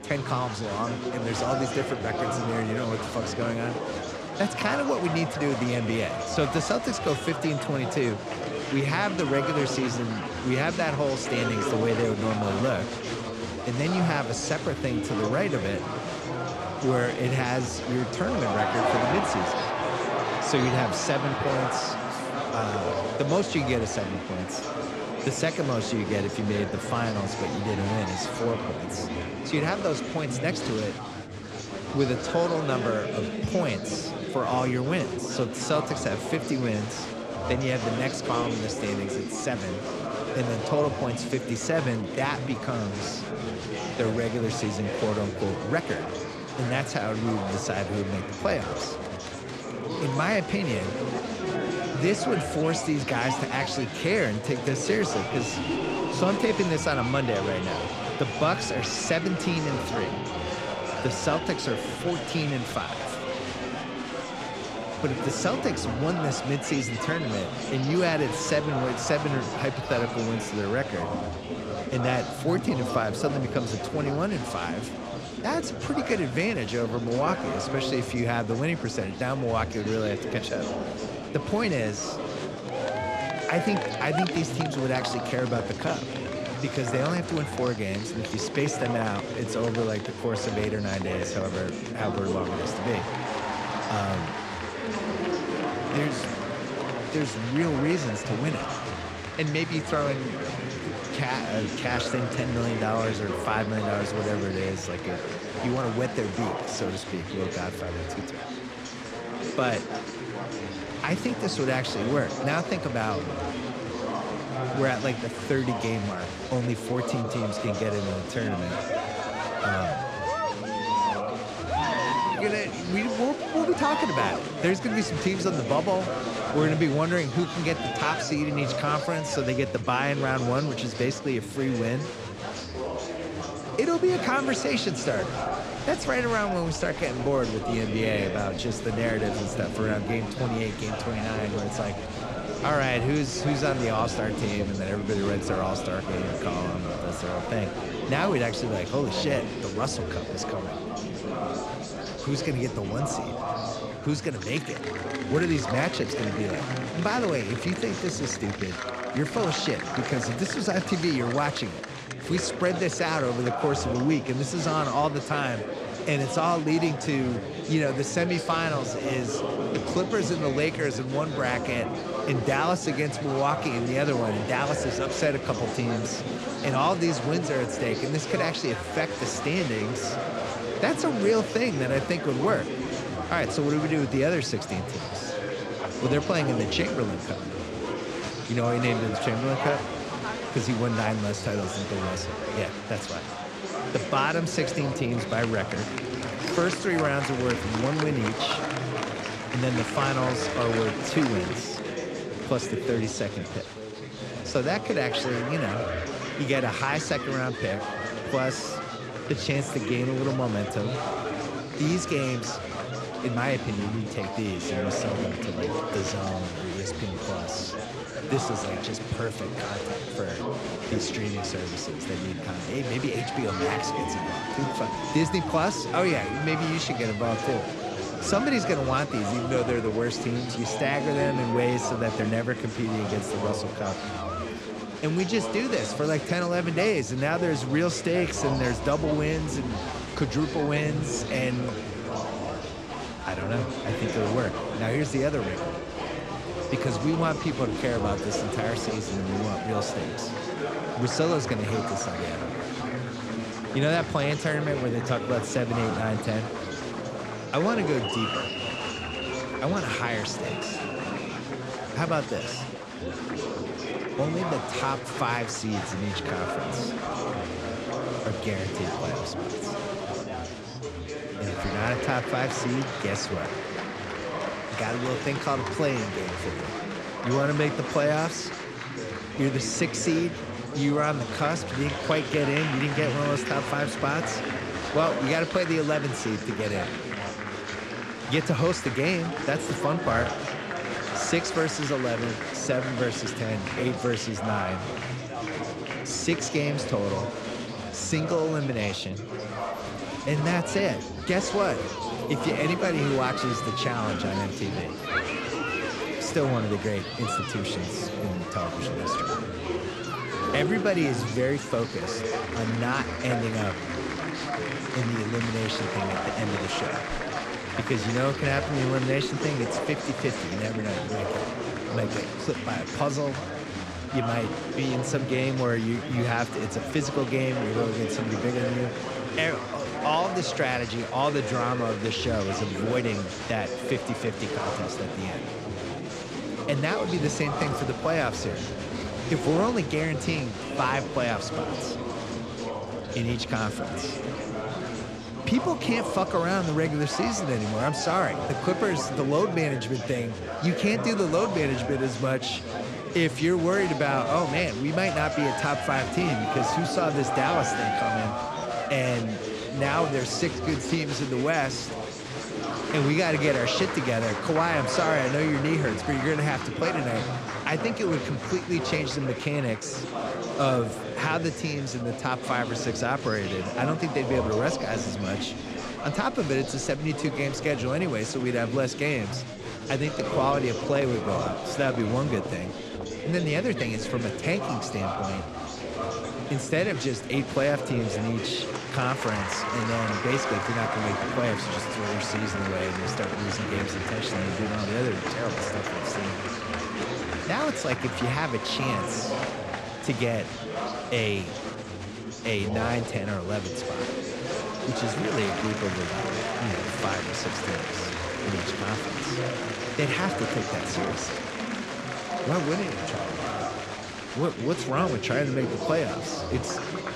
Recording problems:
chatter from many people; loud; throughout; 3 dB below the speech

